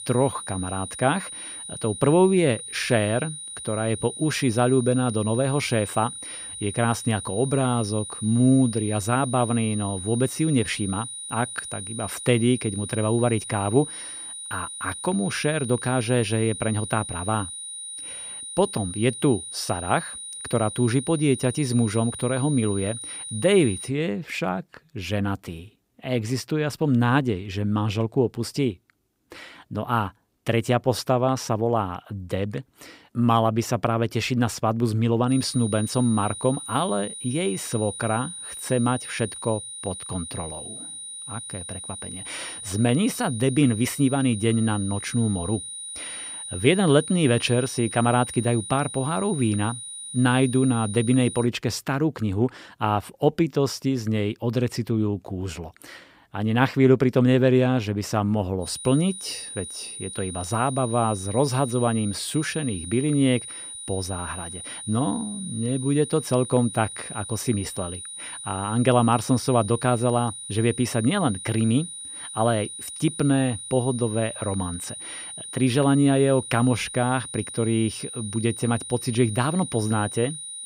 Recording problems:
high-pitched whine; loud; until 24 s, from 35 to 51 s and from 59 s on; 9.5 kHz, 10 dB below the speech

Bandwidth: 15.5 kHz